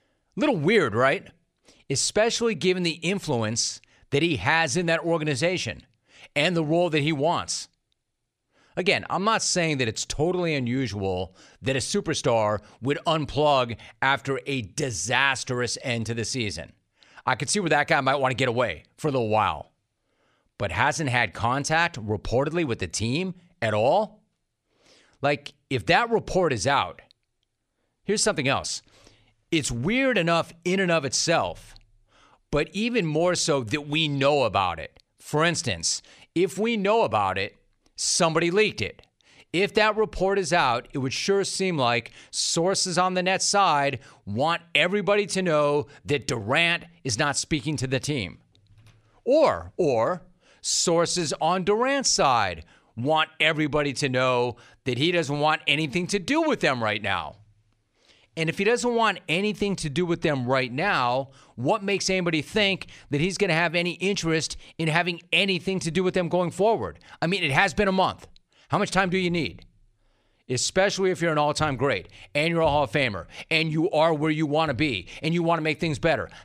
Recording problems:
none

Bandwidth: 14.5 kHz